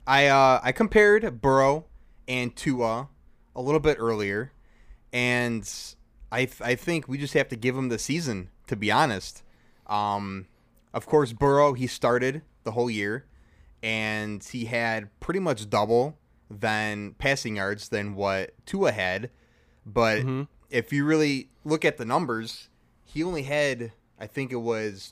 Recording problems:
none

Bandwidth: 15 kHz